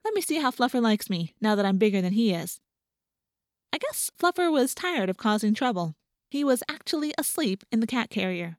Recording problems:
none

